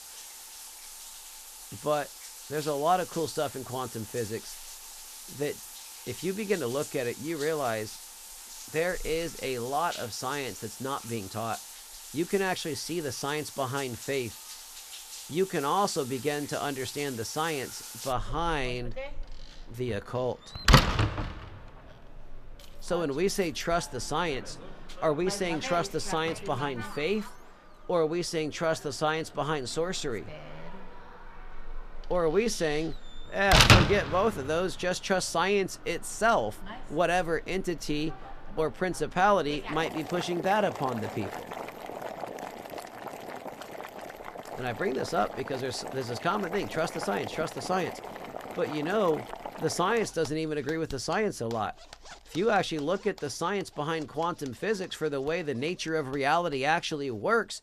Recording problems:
household noises; loud; throughout; 4 dB below the speech

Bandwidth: 14.5 kHz